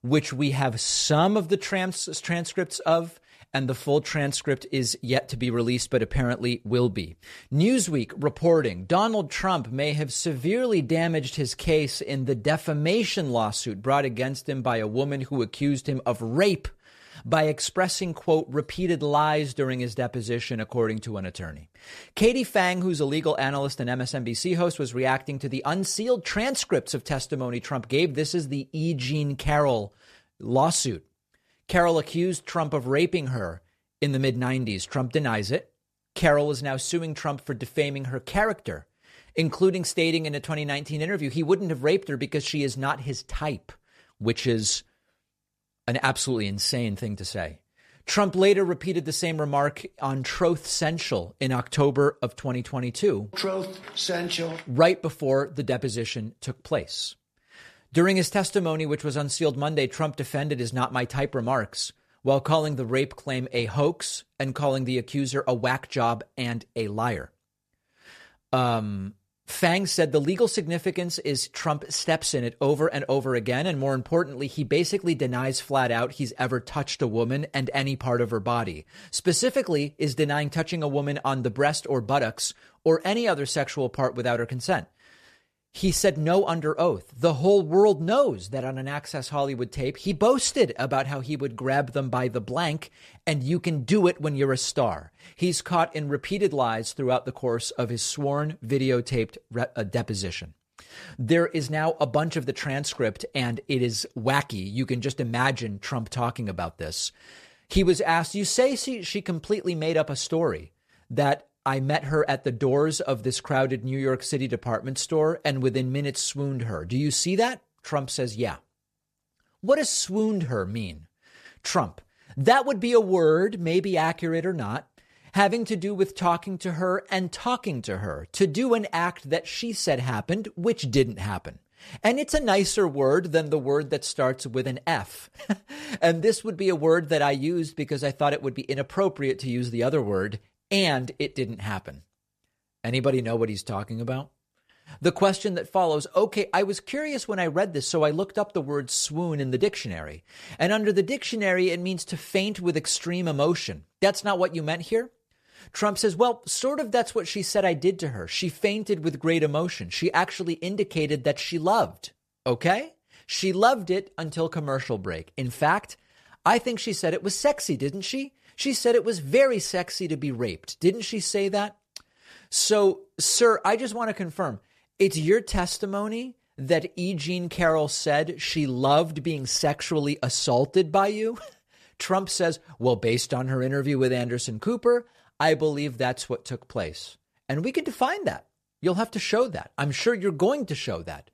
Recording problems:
none

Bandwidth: 14 kHz